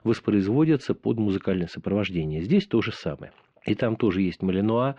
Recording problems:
muffled; slightly; fading above 3 kHz

